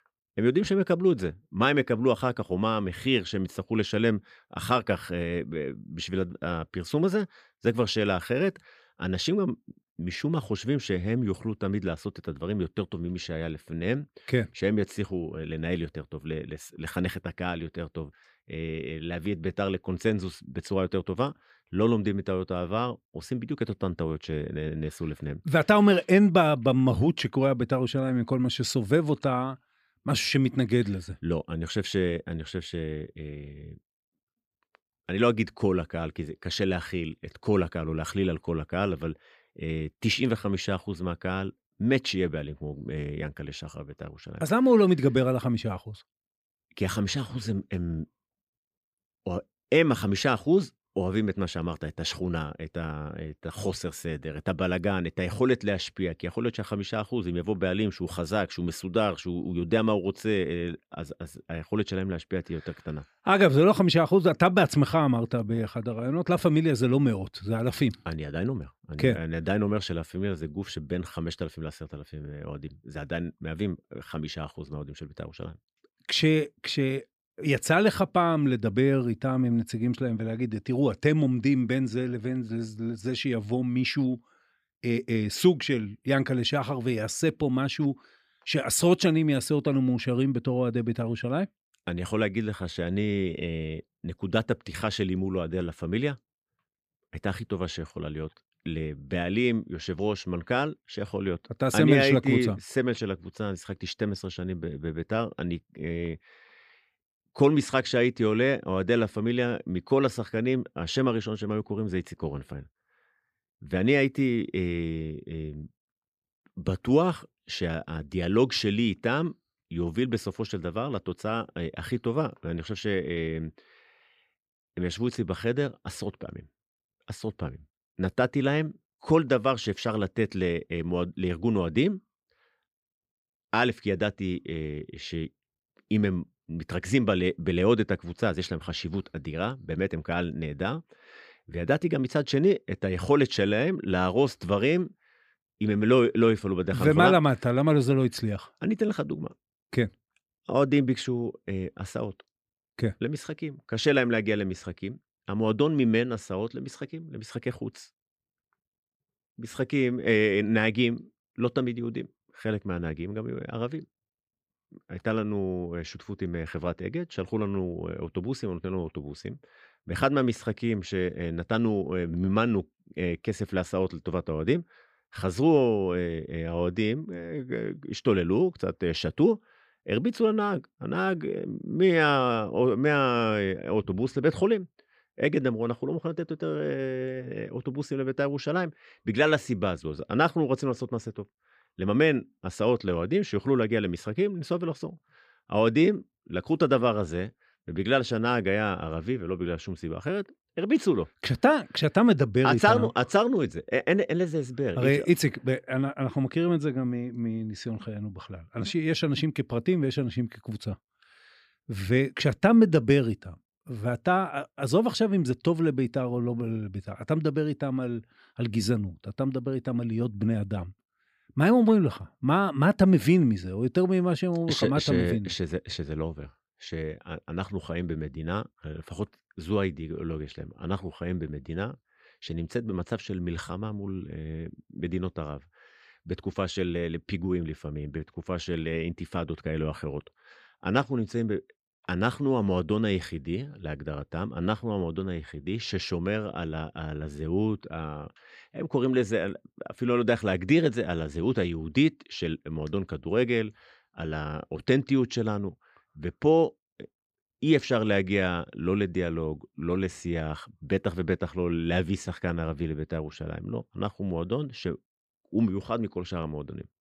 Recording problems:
none

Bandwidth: 15 kHz